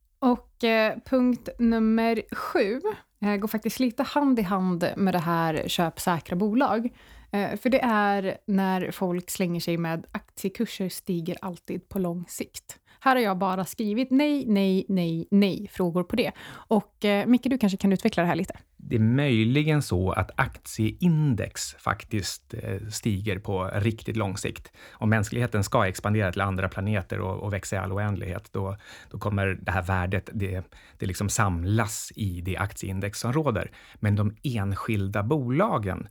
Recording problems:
none

